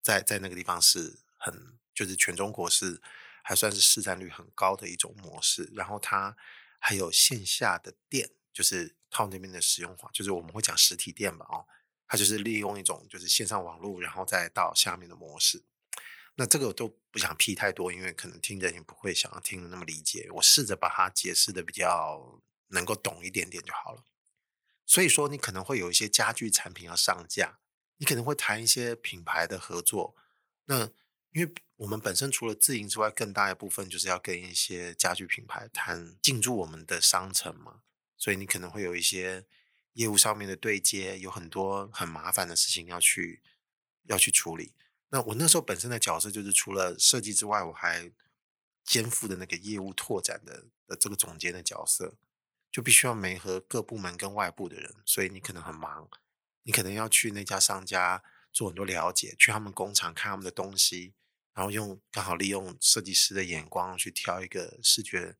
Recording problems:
thin; somewhat; fading below 800 Hz

